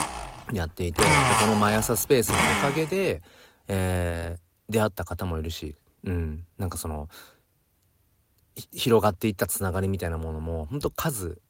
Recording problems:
garbled, watery; slightly; nothing above 16 kHz
household noises; very loud; until 2.5 s; 4 dB above the speech

